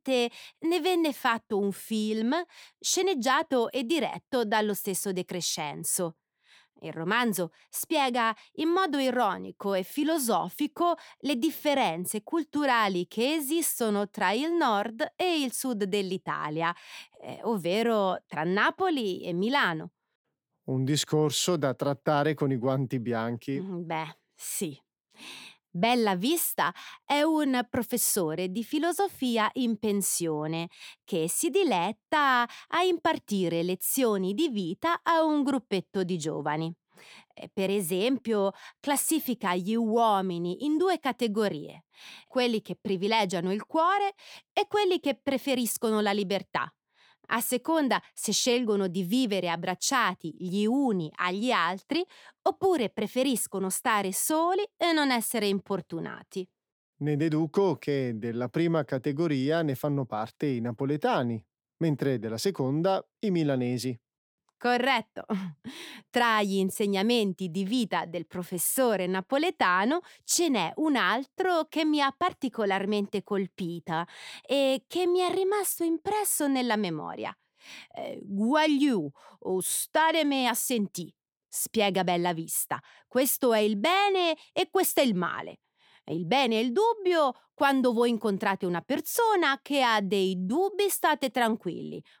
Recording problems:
none

